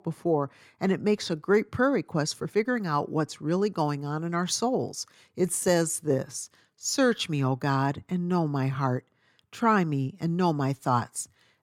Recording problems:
uneven, jittery; slightly; from 2.5 to 8.5 s

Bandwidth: 18 kHz